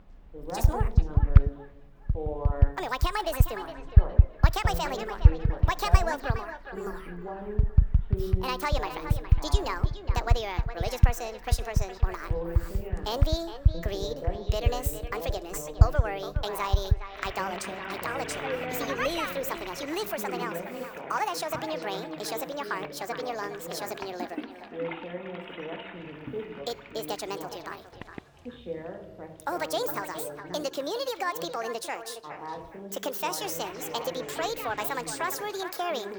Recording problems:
echo of what is said; strong; throughout; 410 ms later, 10 dB below the speech
wrong speed and pitch; too fast and too high; 1.6 times normal speed
household noises; very loud; throughout; 5 dB above the speech
voice in the background; loud; throughout; 7 dB below the speech
traffic noise; faint; throughout; 30 dB below the speech

